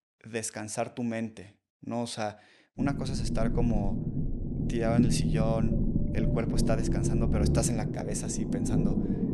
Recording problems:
low rumble; loud; from 3 s on; 2 dB below the speech

